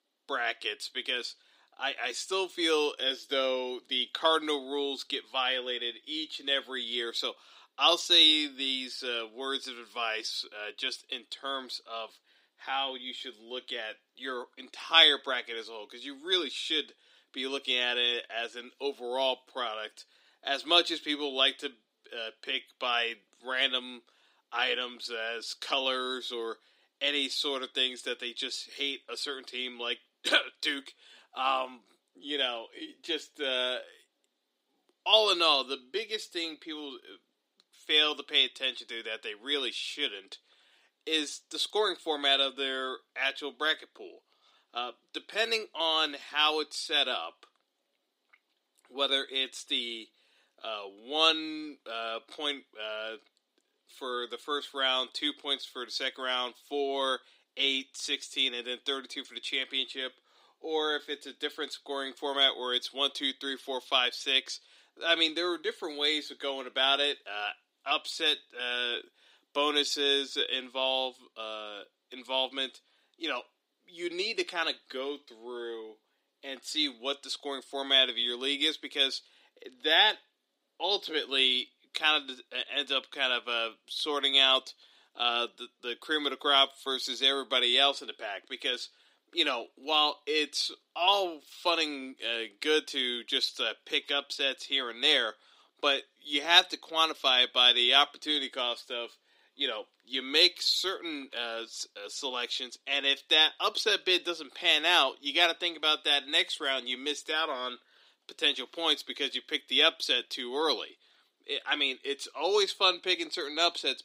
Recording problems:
thin; very slightly; fading below 250 Hz

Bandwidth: 15.5 kHz